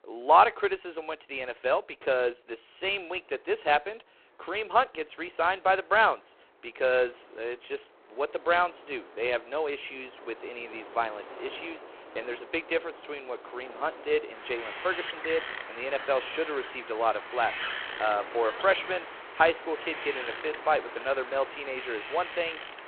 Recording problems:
phone-call audio; poor line
wind in the background; noticeable; throughout; 10 dB below the speech

